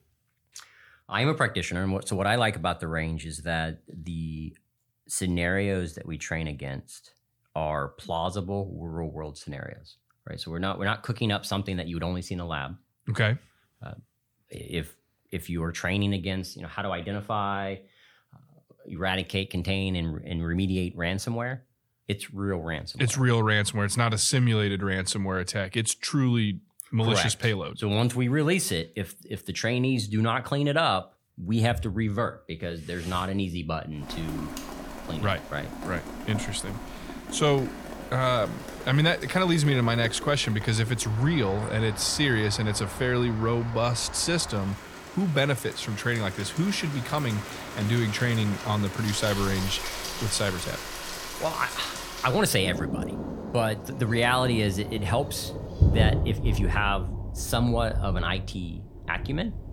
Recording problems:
rain or running water; loud; from 34 s on; 7 dB below the speech

